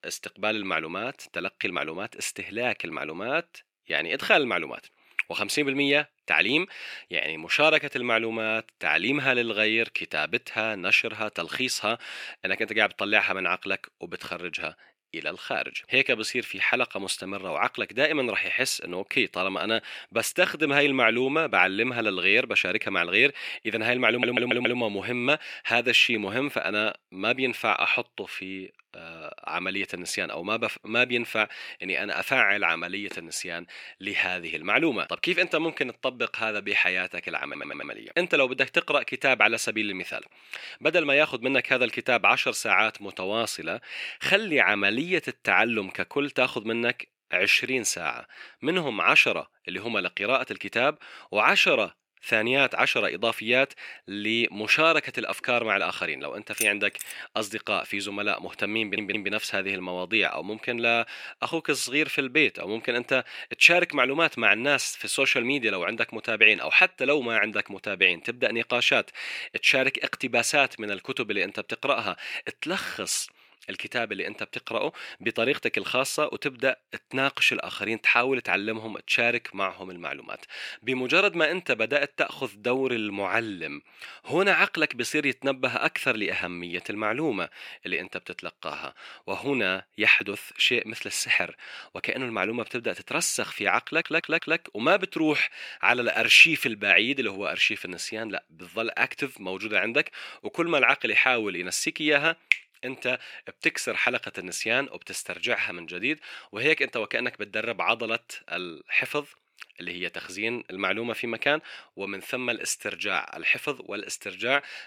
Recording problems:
thin; somewhat; fading below 350 Hz
audio stuttering; 4 times, first at 24 s
jangling keys; noticeable; at 57 s; peak 7 dB below the speech

